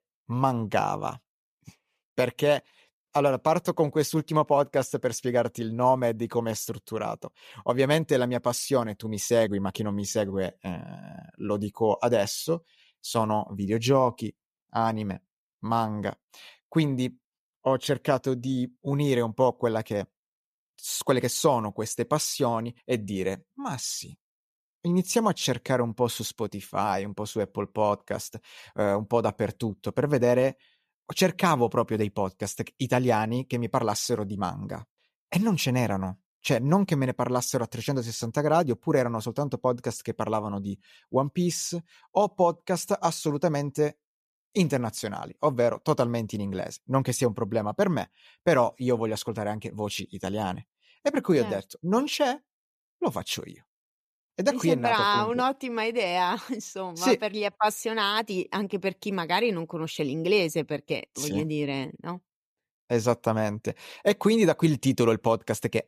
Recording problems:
none

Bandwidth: 14.5 kHz